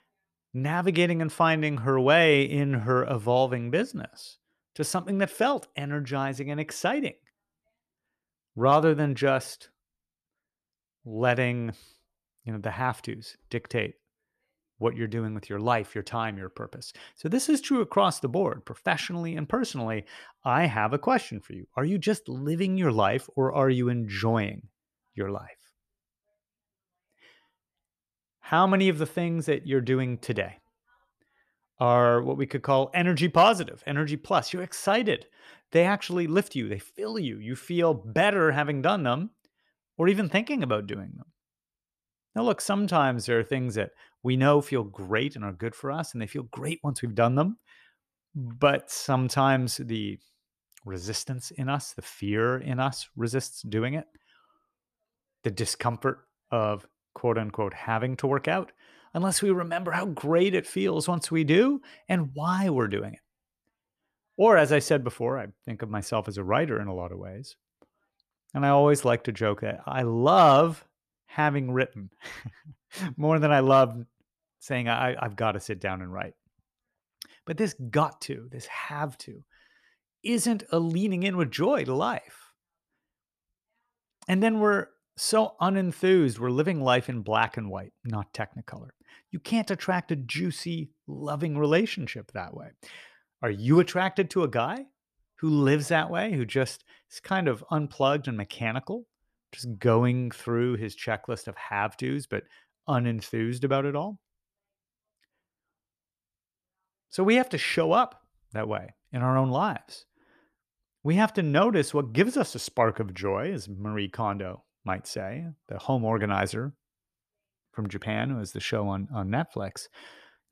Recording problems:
none

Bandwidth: 14 kHz